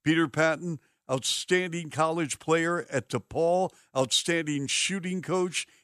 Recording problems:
none

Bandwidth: 15 kHz